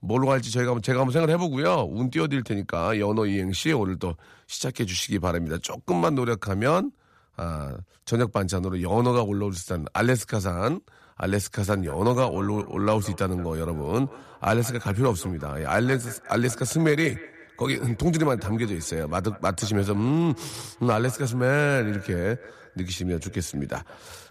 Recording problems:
echo of what is said; faint; from 12 s on; 180 ms later, 20 dB below the speech

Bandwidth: 14.5 kHz